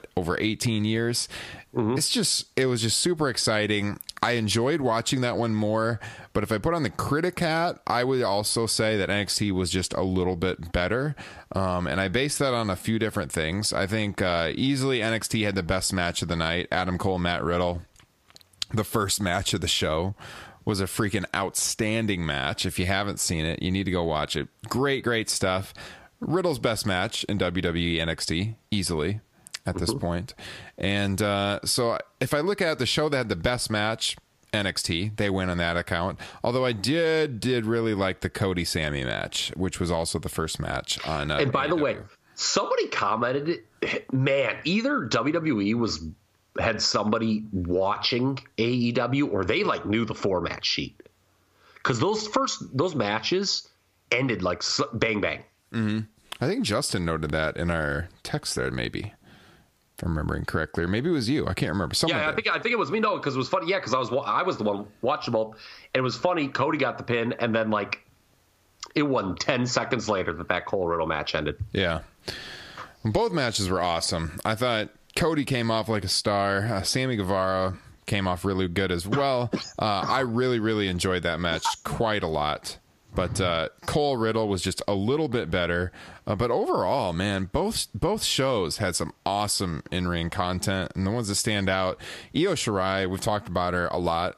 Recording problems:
squashed, flat; heavily

